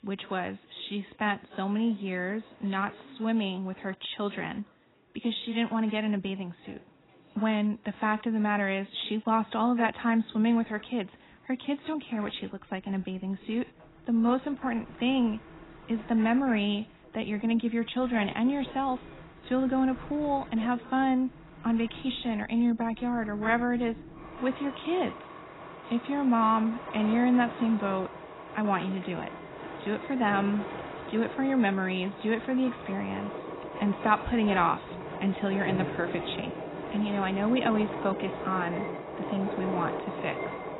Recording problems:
garbled, watery; badly; nothing above 4 kHz
train or aircraft noise; noticeable; throughout; 10 dB below the speech

